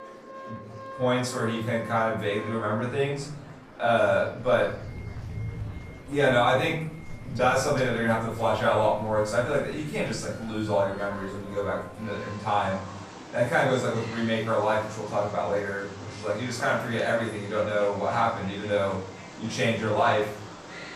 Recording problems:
off-mic speech; far
room echo; noticeable; dies away in 0.5 s
animal sounds; noticeable; throughout; 15 dB below the speech
background music; faint; throughout; 20 dB below the speech
murmuring crowd; faint; throughout; 20 dB below the speech

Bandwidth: 14.5 kHz